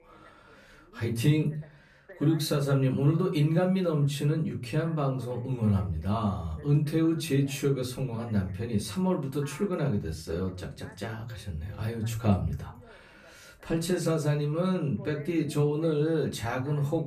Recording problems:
off-mic speech; far
room echo; very slight; dies away in 0.3 s
voice in the background; faint; throughout; 25 dB below the speech

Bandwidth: 14.5 kHz